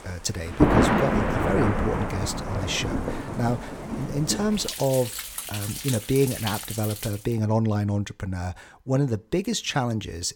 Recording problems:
rain or running water; loud; until 7 s; 1 dB below the speech

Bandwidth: 17.5 kHz